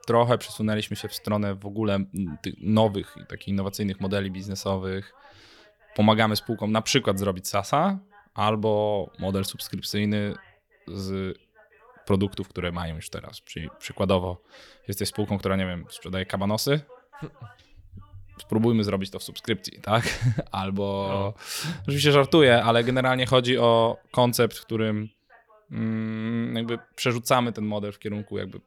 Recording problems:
voice in the background; faint; throughout; 30 dB below the speech

